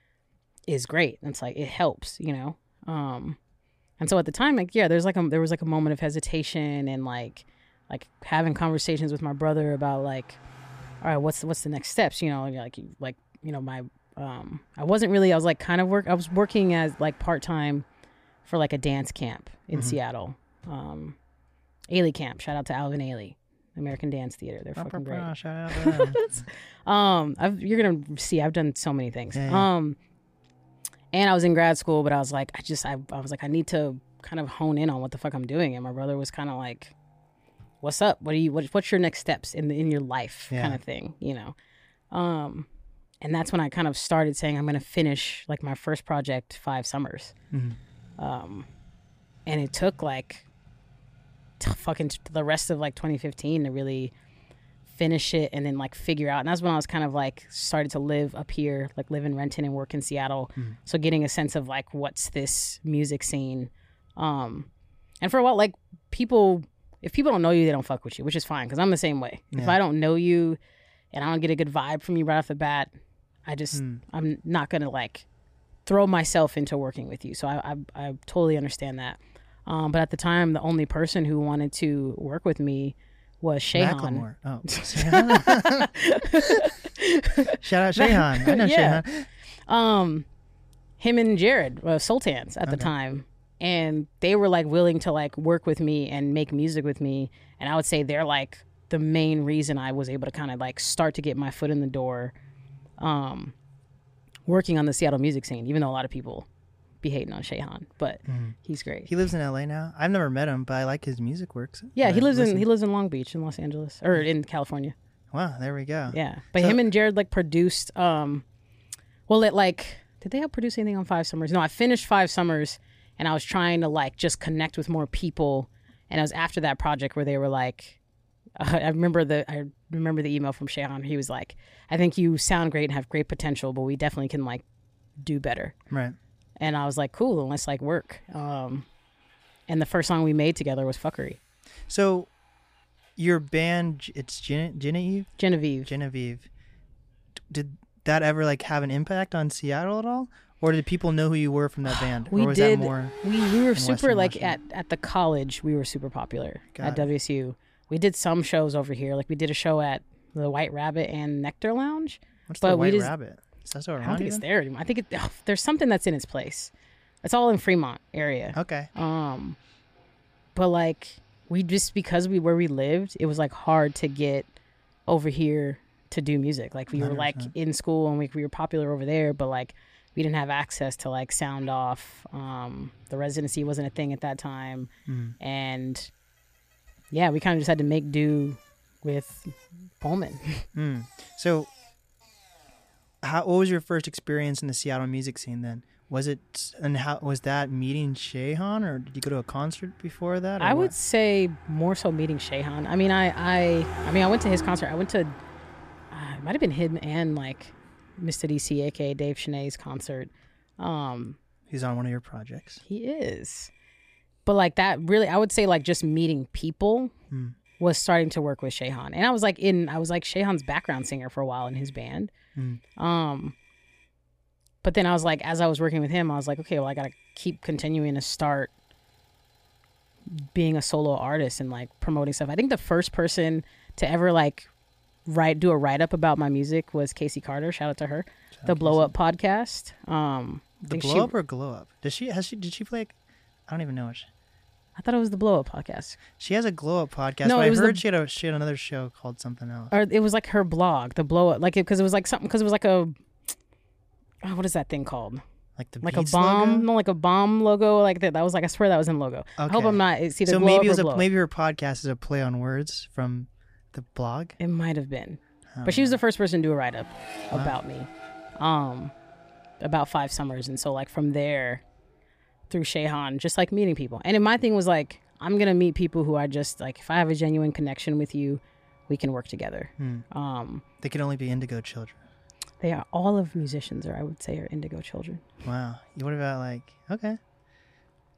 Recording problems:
traffic noise; faint; throughout; 25 dB below the speech

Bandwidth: 15 kHz